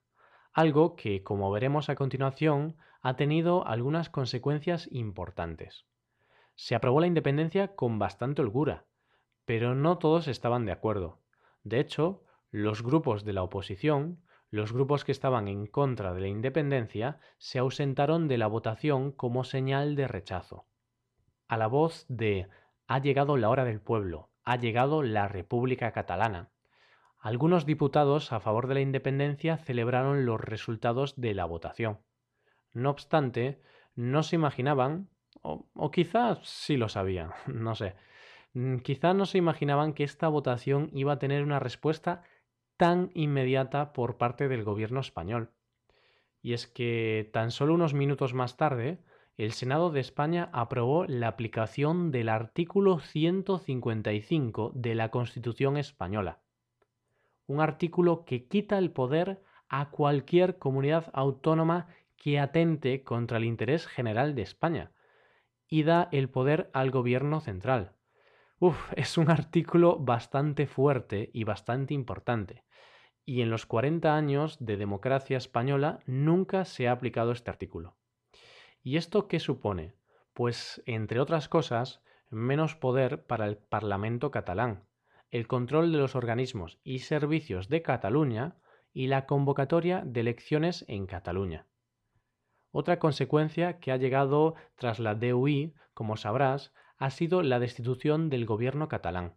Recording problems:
uneven, jittery; strongly; from 1.5 s to 1:33

